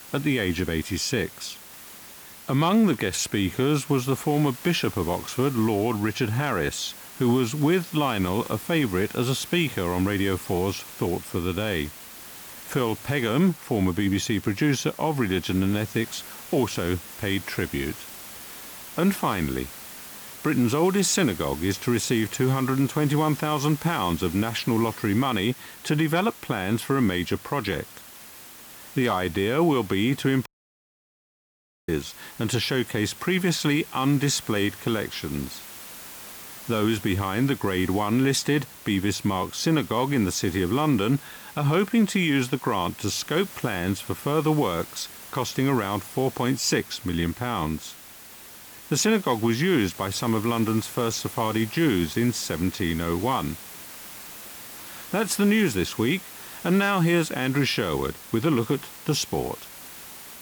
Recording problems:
hiss; noticeable; throughout; 15 dB below the speech
audio cutting out; at 30 s for 1.5 s

